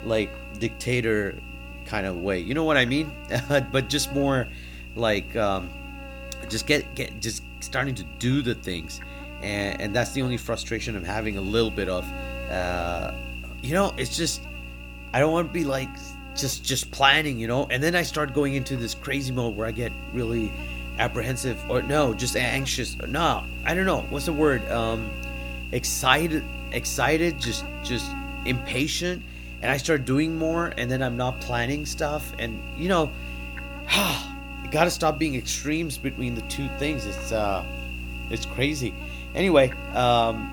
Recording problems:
electrical hum; noticeable; throughout; 60 Hz, 10 dB below the speech

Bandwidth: 18.5 kHz